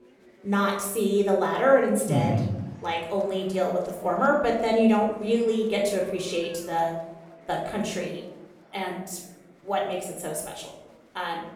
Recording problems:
room echo; noticeable; dies away in 0.8 s
off-mic speech; somewhat distant
chatter from many people; faint; throughout; 30 dB below the speech

